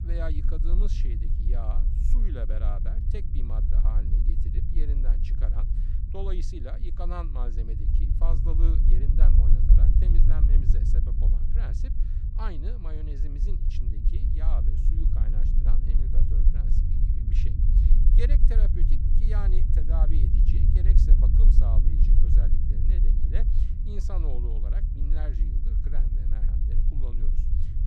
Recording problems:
low rumble; loud; throughout; 1 dB below the speech

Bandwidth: 15 kHz